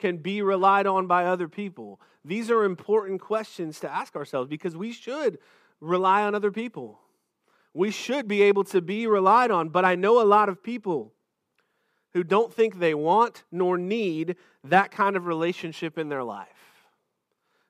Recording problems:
none

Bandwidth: 15 kHz